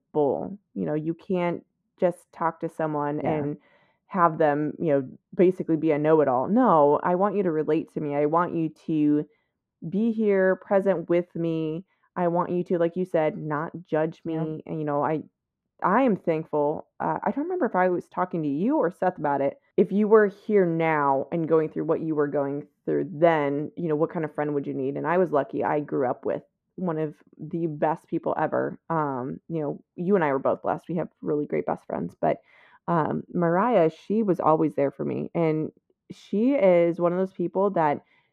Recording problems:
muffled; very; fading above 2 kHz

